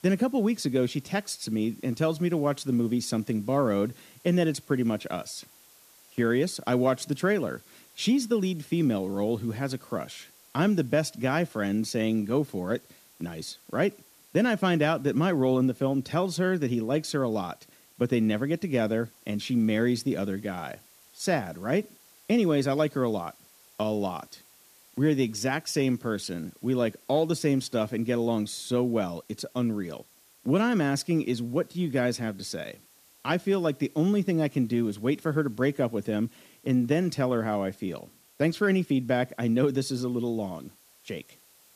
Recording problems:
hiss; faint; throughout; 25 dB below the speech

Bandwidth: 14.5 kHz